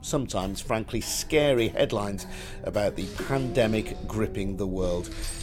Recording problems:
household noises; noticeable; throughout; 20 dB below the speech
low rumble; noticeable; throughout; 15 dB below the speech

